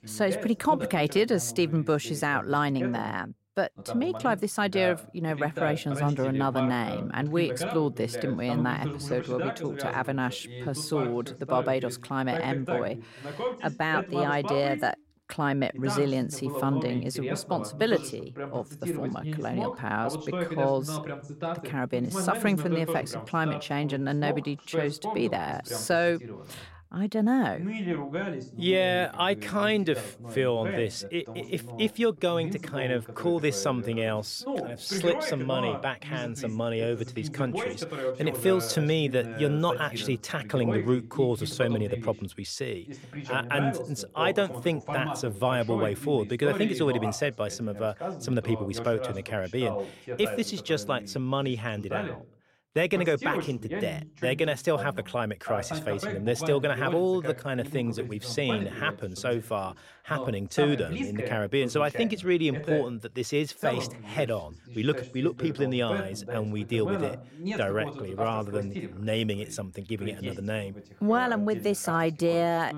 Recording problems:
voice in the background; loud; throughout; 7 dB below the speech

